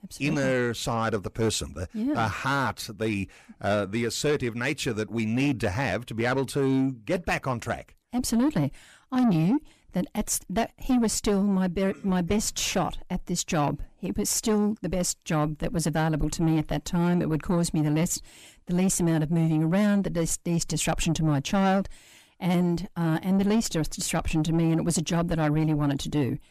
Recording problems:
distortion; slight; 10 dB below the speech

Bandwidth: 14.5 kHz